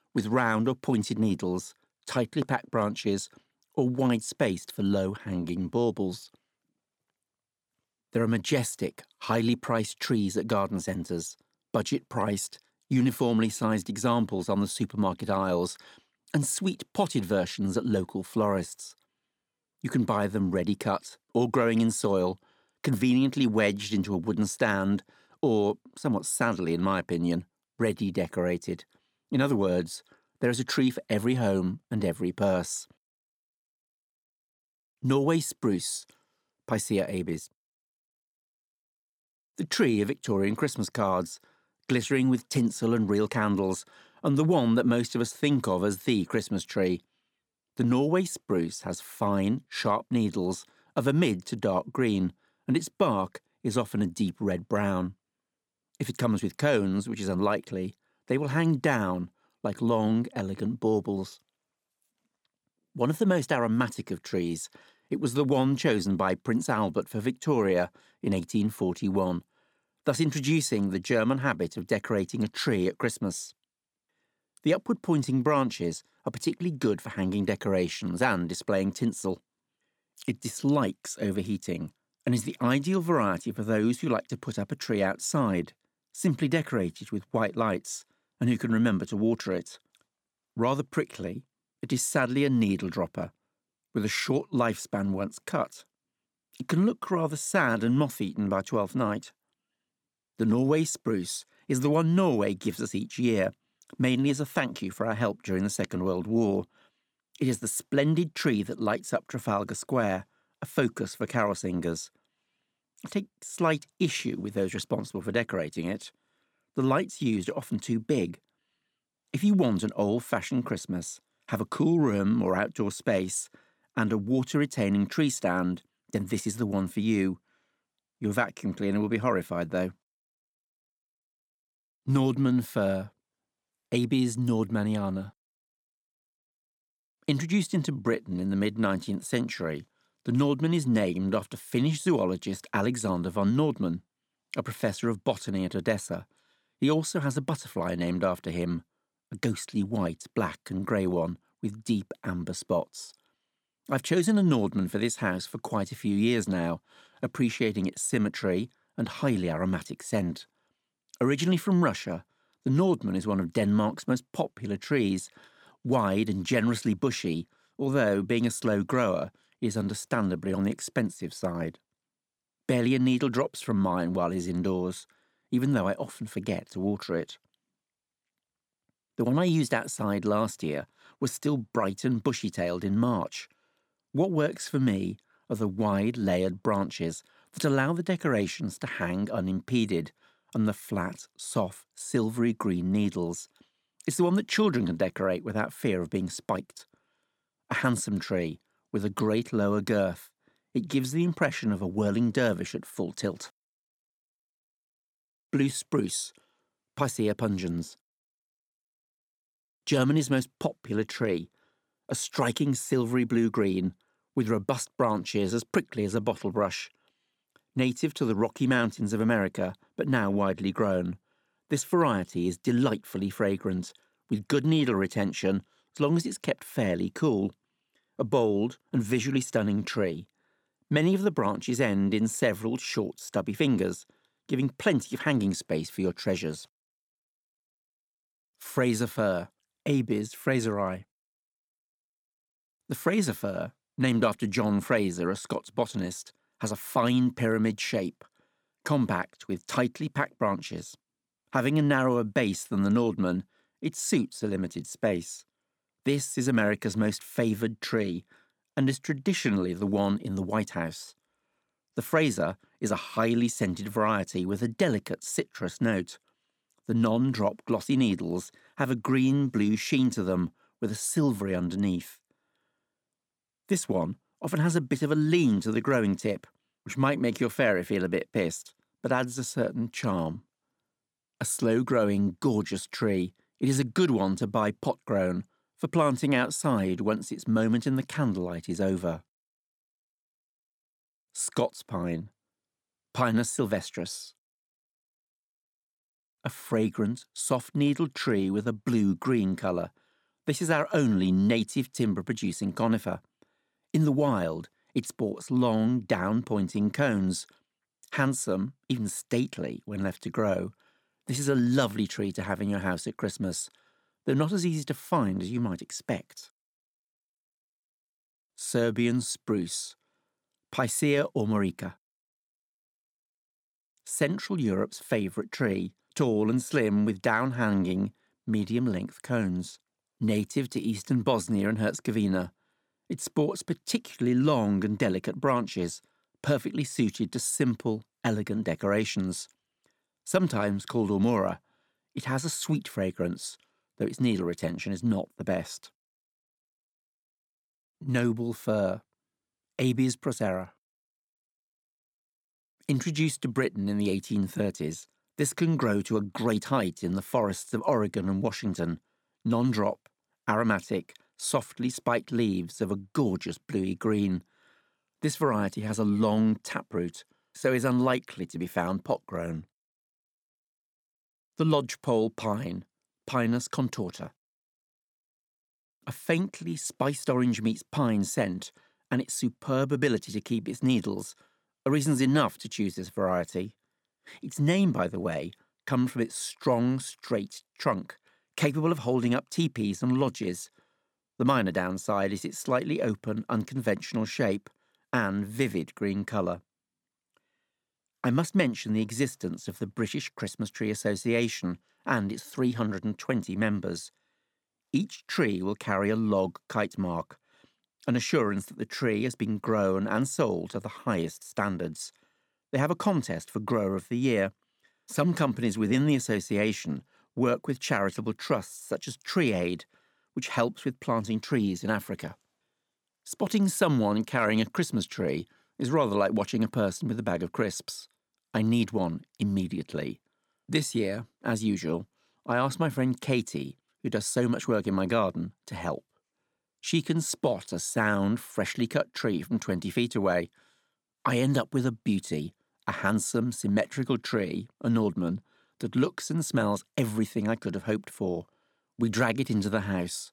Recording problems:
none

